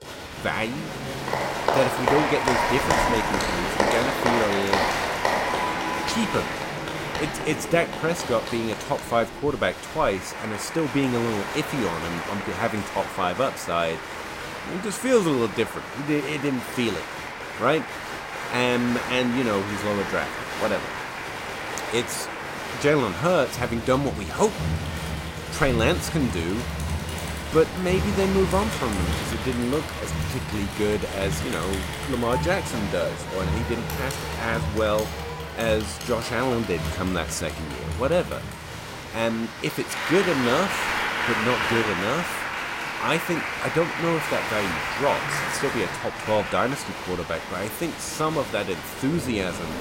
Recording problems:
crowd noise; loud; throughout; 2 dB below the speech

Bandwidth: 16 kHz